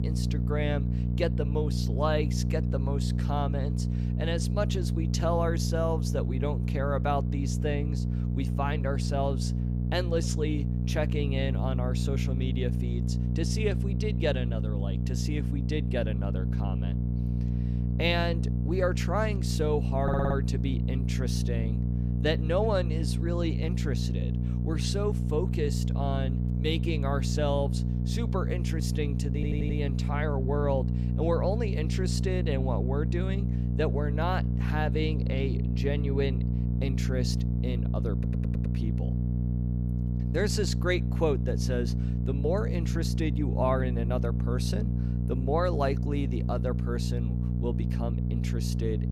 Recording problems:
electrical hum; loud; throughout; 60 Hz, 7 dB below the speech
audio stuttering; at 20 s, at 29 s and at 38 s

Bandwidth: 15.5 kHz